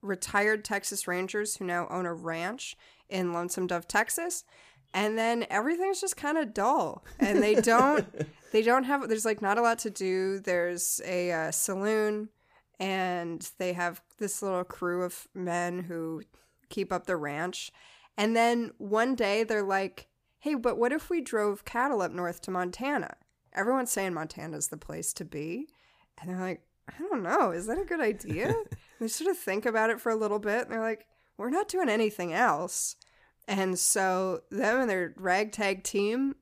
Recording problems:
none

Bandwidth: 15 kHz